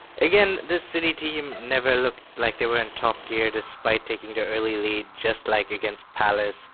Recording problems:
phone-call audio; poor line; nothing above 4 kHz
traffic noise; faint; throughout; 20 dB below the speech

